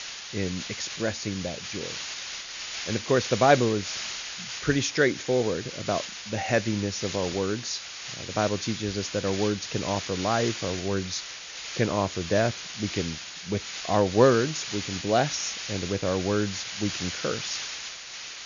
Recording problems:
high frequencies cut off; noticeable; nothing above 7 kHz
hiss; loud; throughout; 7 dB below the speech

